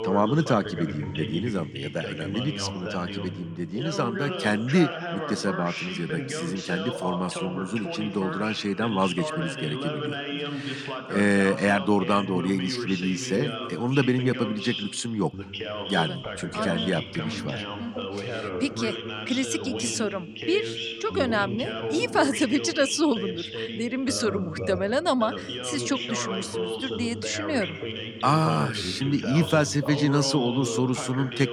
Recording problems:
voice in the background; loud; throughout; 6 dB below the speech

